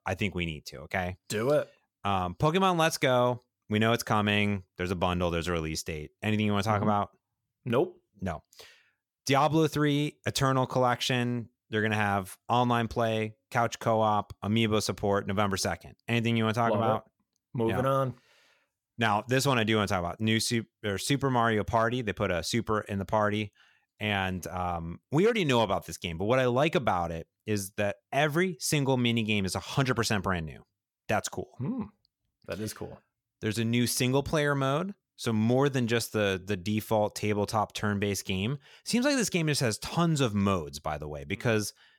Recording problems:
none

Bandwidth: 17.5 kHz